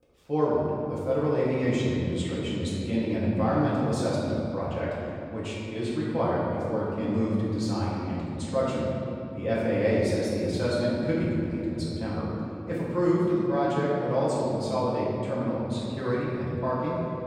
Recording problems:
room echo; strong; dies away in 2.7 s
off-mic speech; far

